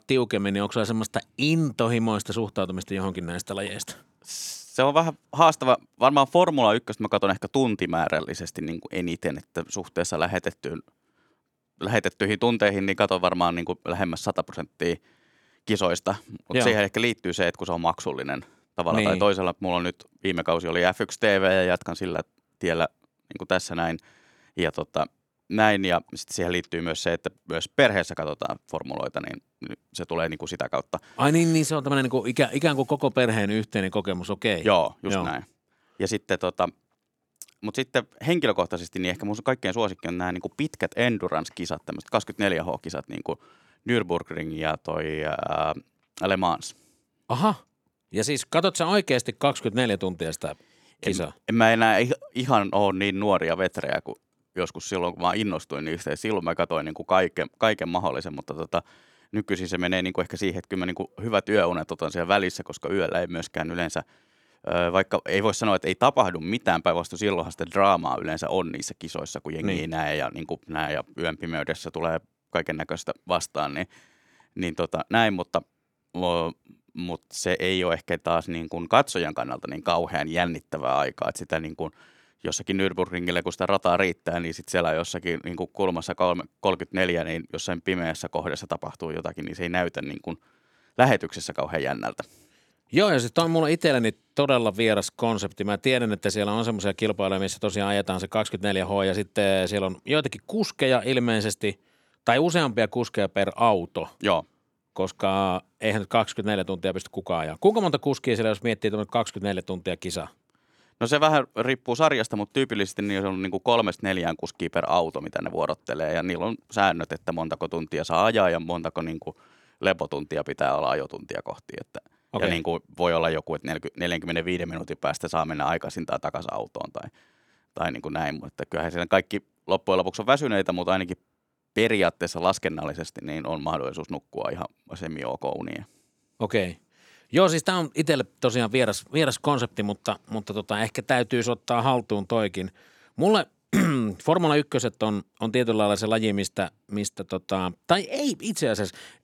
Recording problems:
none

